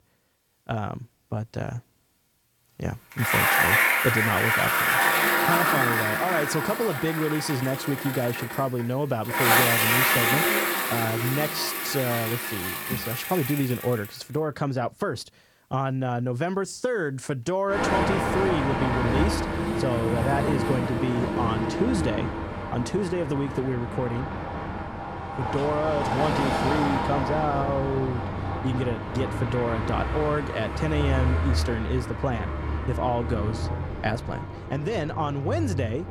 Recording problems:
traffic noise; very loud; throughout; 3 dB above the speech

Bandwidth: 18 kHz